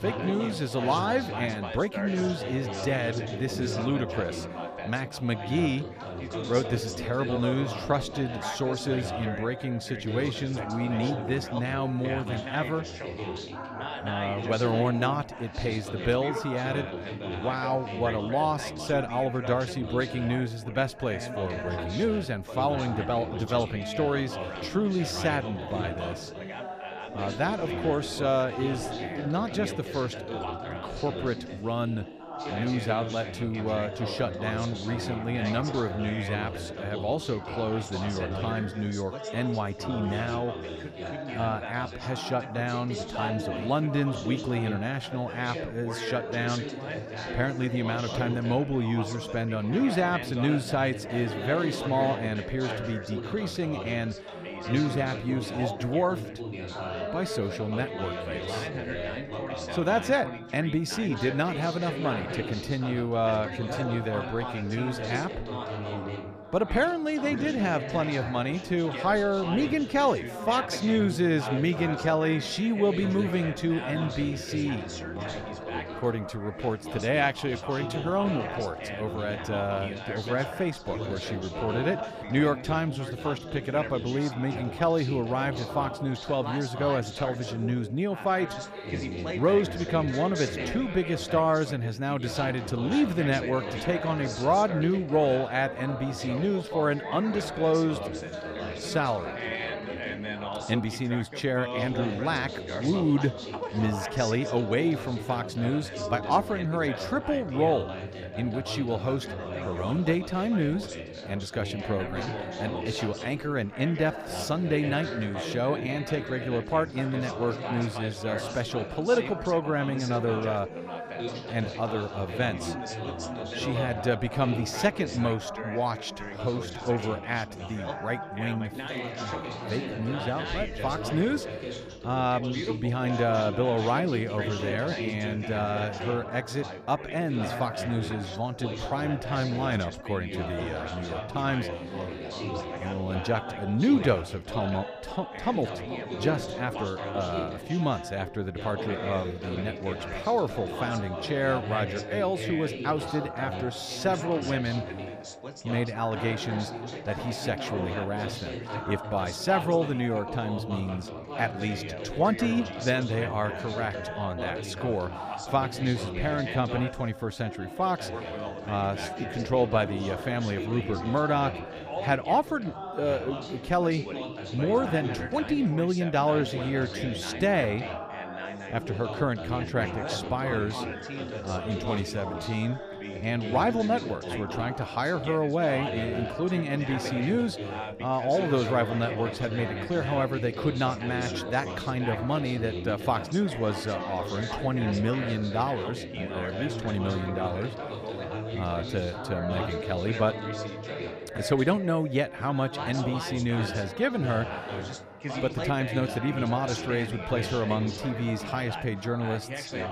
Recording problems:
background chatter; loud; throughout; 4 voices, 6 dB below the speech

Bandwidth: 15 kHz